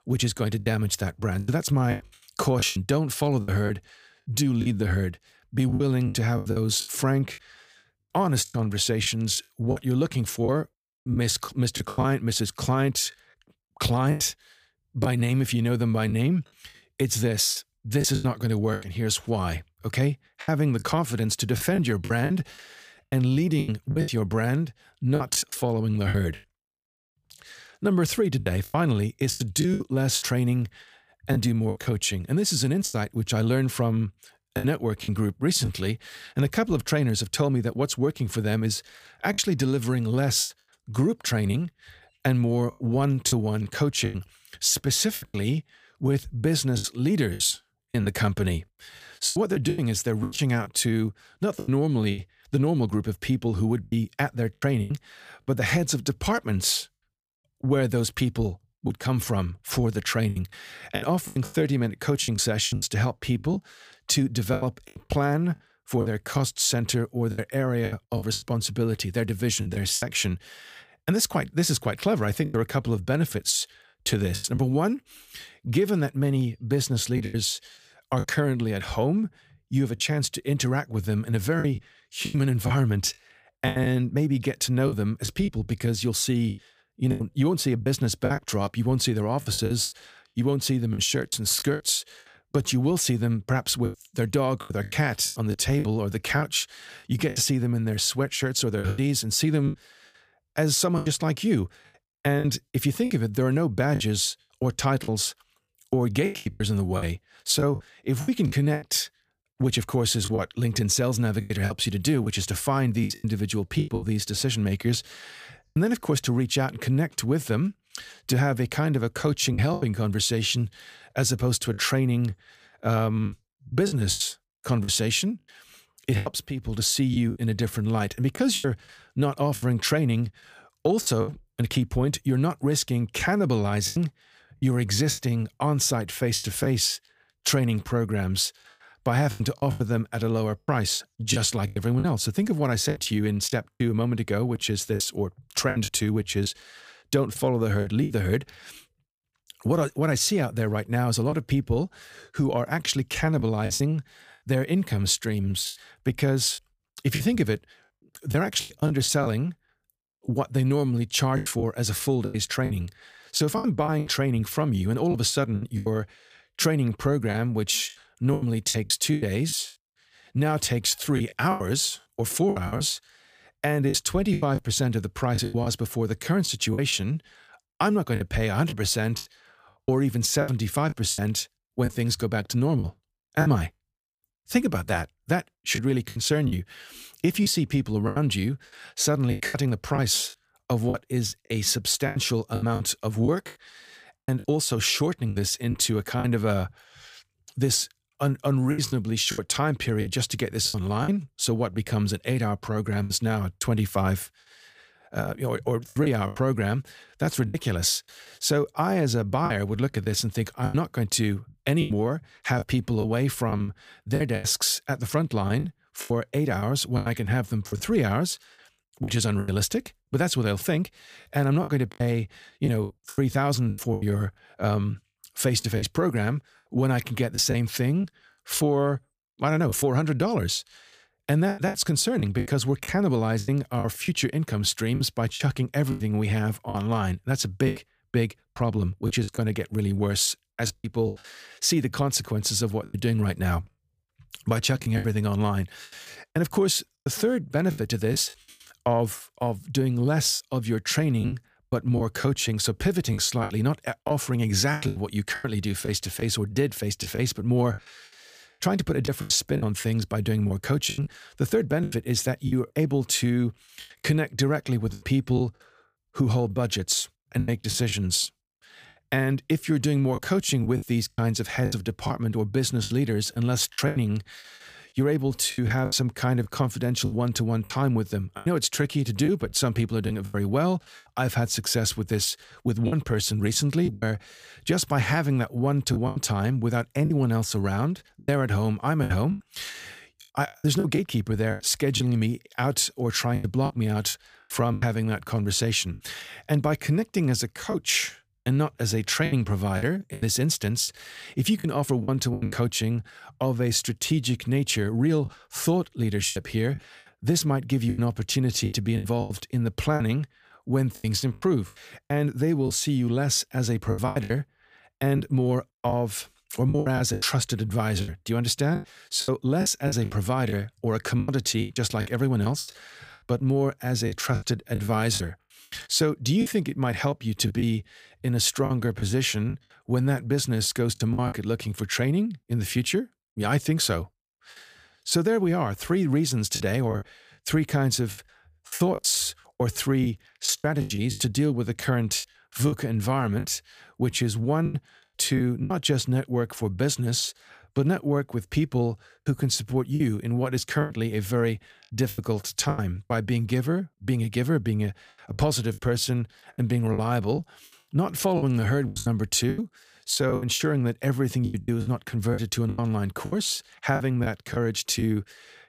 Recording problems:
choppy; very; 9% of the speech affected

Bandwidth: 15 kHz